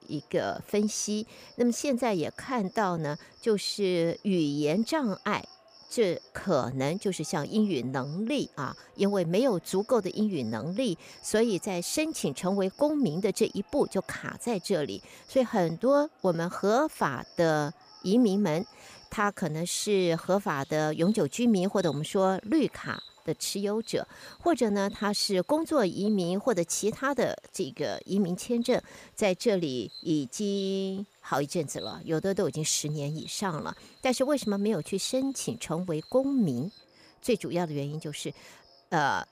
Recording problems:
animal sounds; faint; throughout; 25 dB below the speech

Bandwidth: 15 kHz